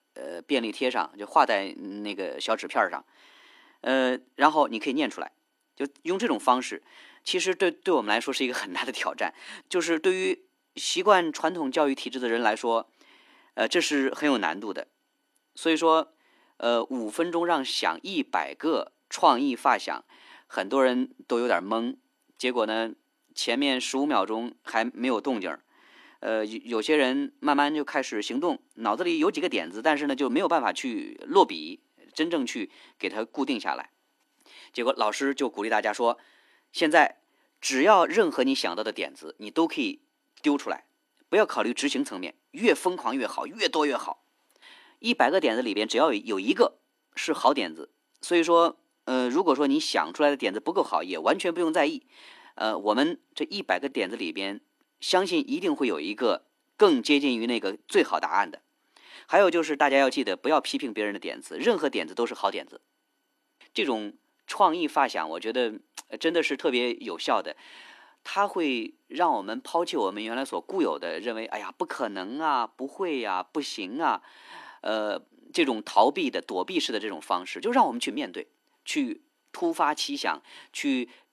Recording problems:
thin; somewhat; fading below 250 Hz

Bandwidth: 14.5 kHz